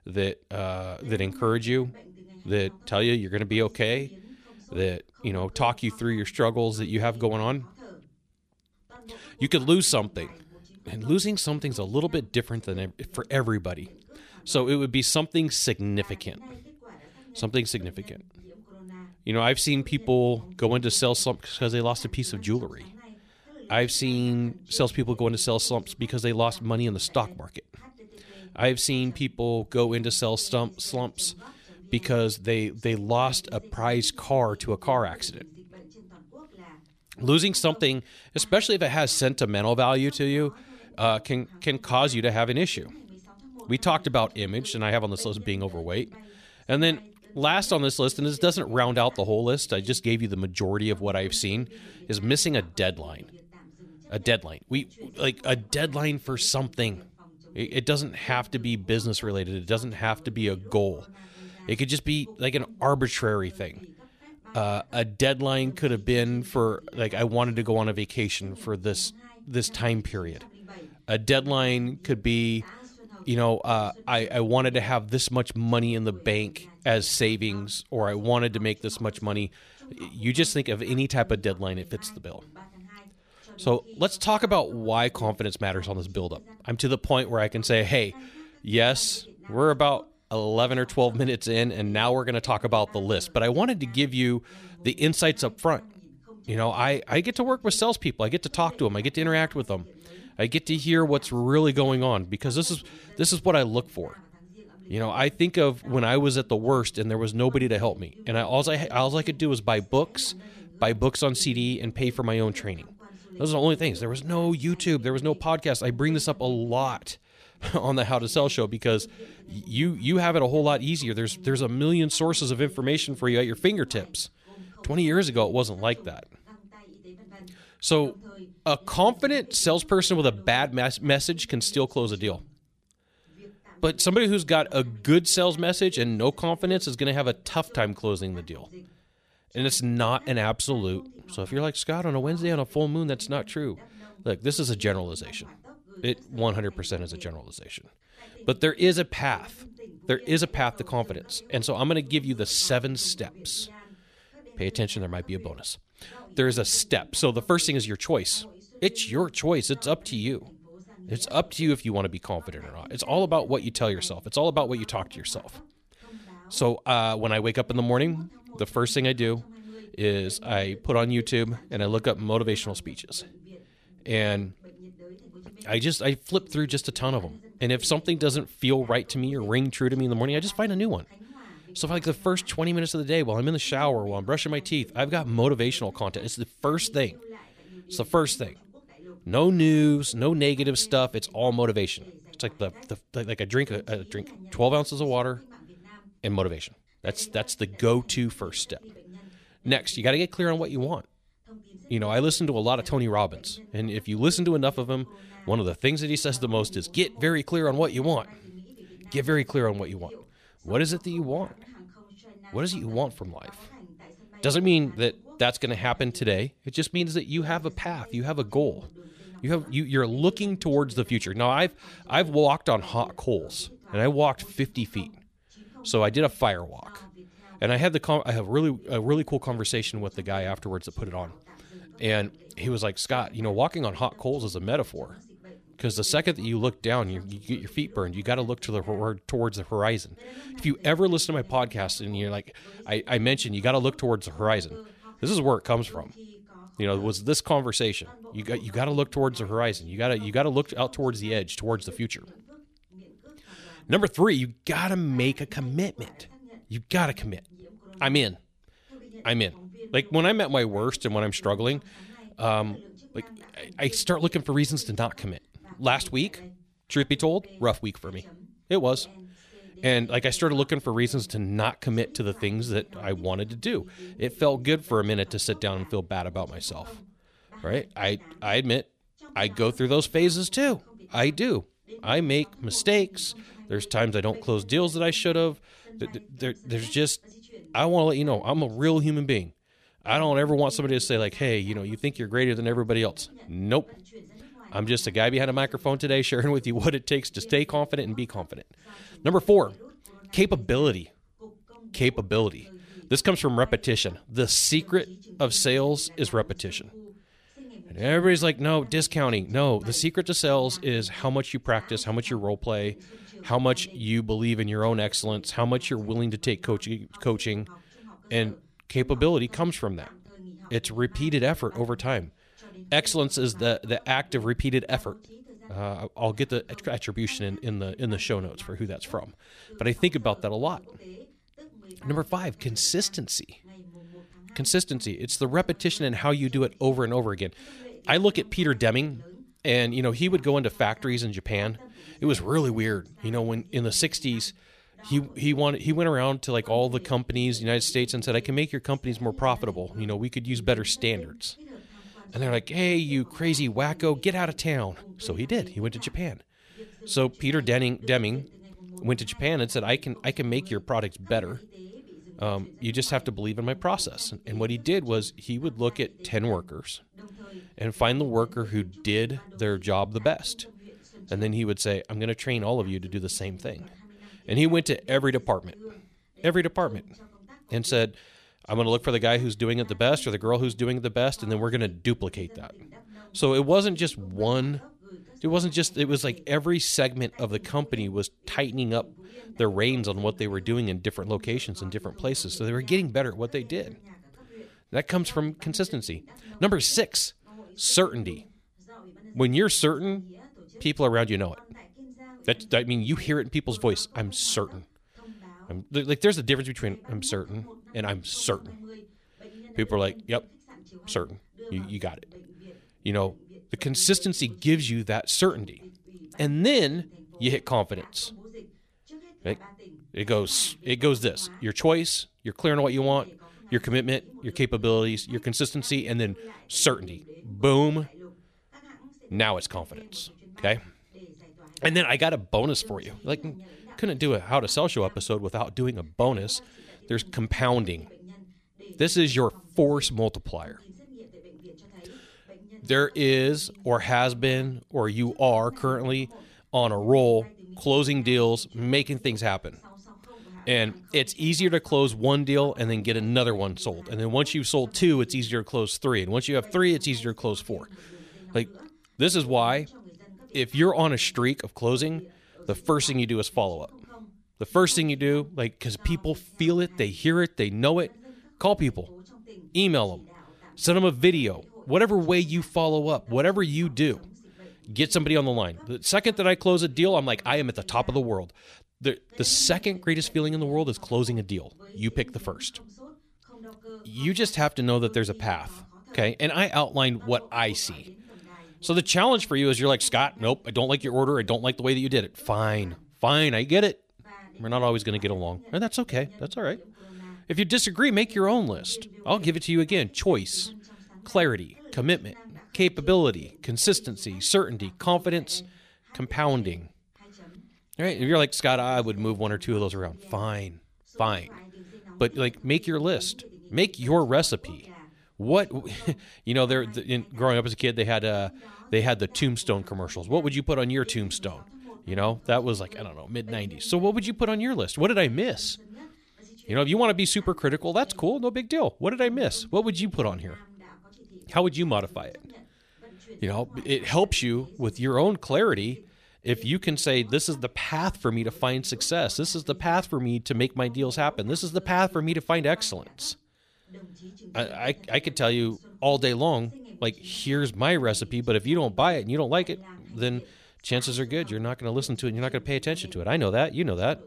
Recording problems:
voice in the background; faint; throughout; 25 dB below the speech

